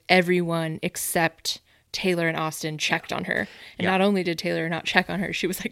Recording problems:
none

